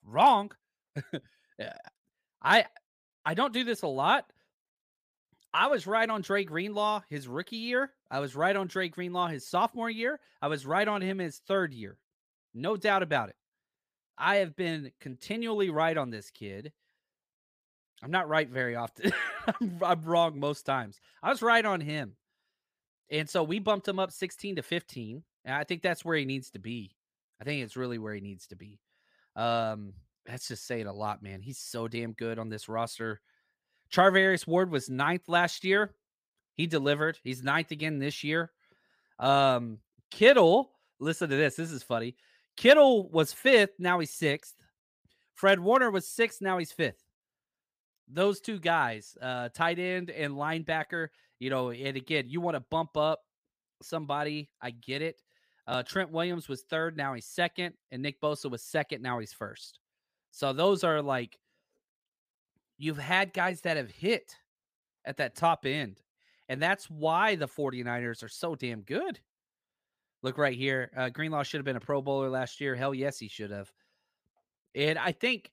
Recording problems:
none

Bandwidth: 15 kHz